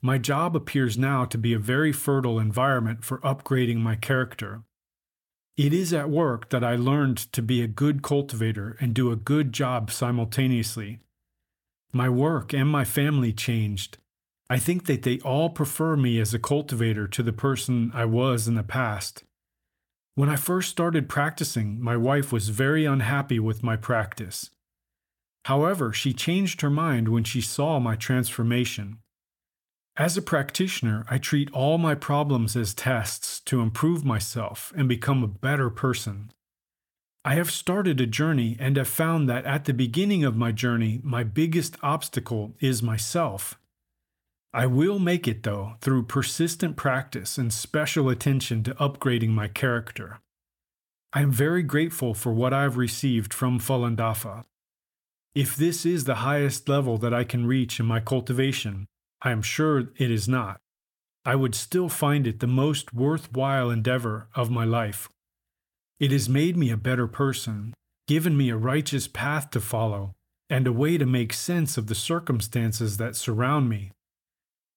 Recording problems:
none

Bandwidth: 17.5 kHz